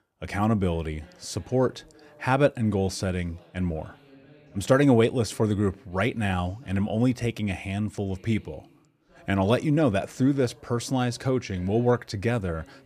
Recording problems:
voice in the background; faint; throughout; 30 dB below the speech

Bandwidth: 14.5 kHz